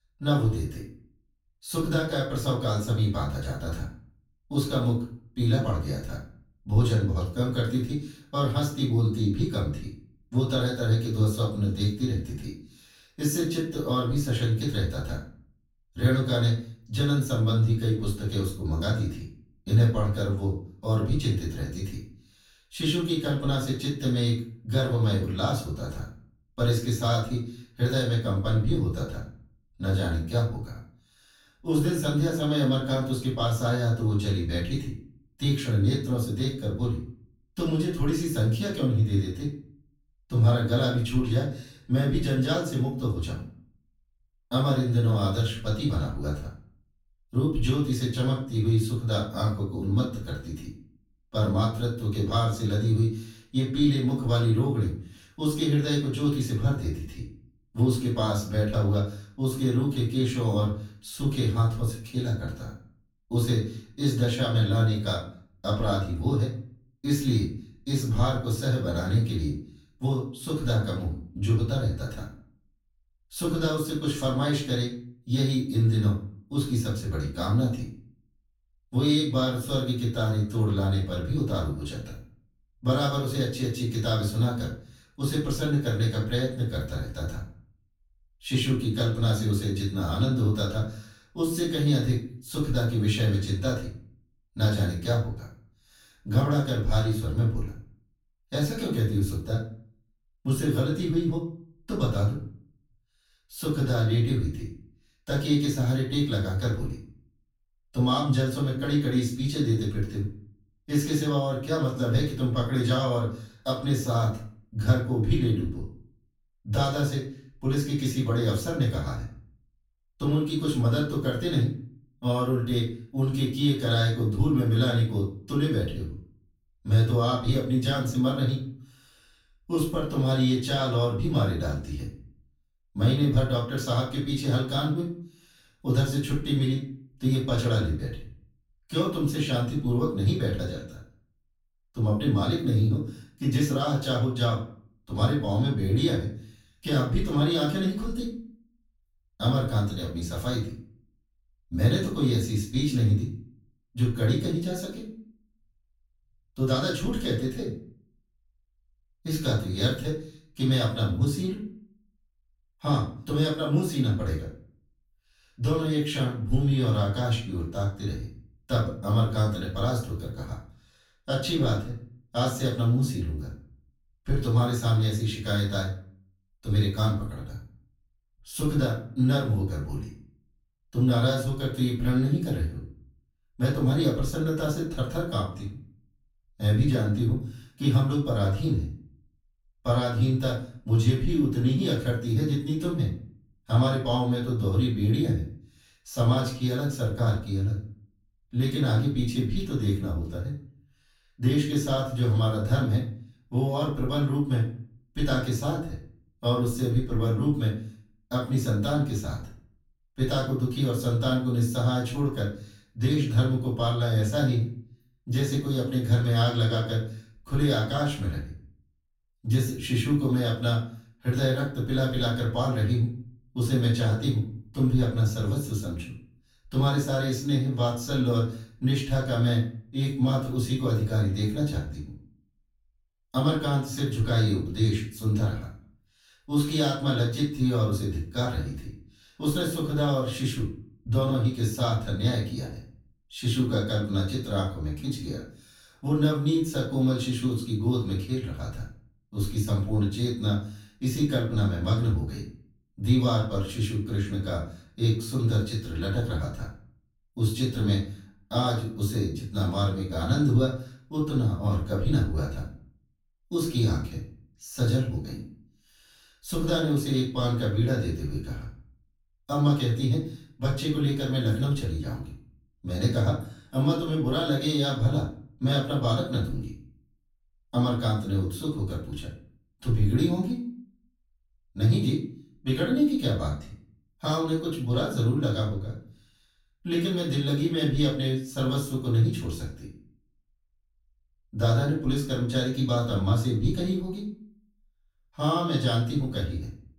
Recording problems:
off-mic speech; far
room echo; noticeable; dies away in 0.4 s

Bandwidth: 17 kHz